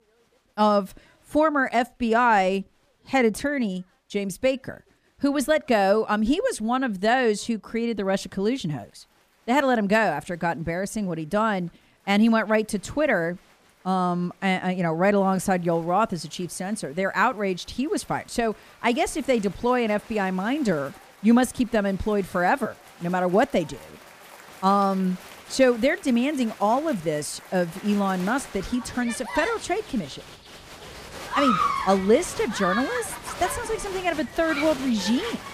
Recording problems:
crowd noise; noticeable; throughout; 10 dB below the speech

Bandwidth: 15 kHz